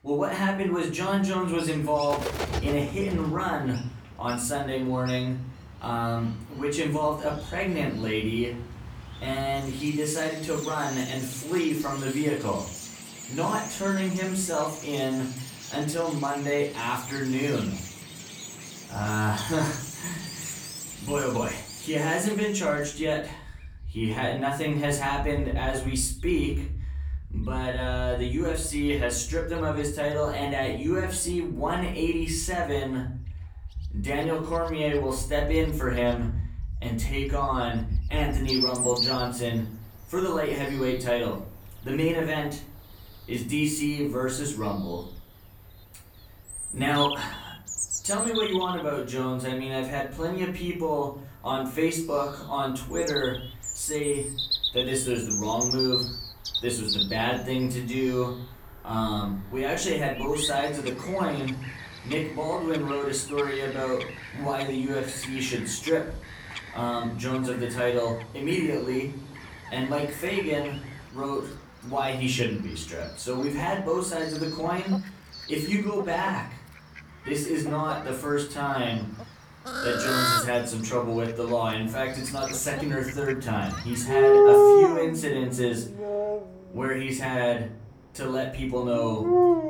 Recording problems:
off-mic speech; far
room echo; slight; dies away in 0.4 s
animal sounds; loud; throughout; 1 dB below the speech

